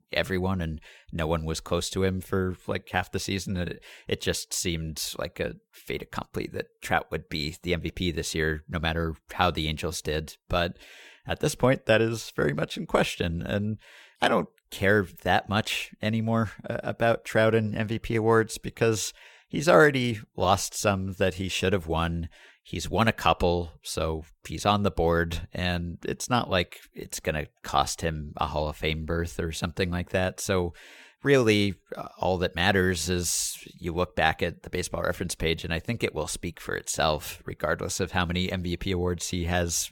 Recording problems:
none

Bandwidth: 17 kHz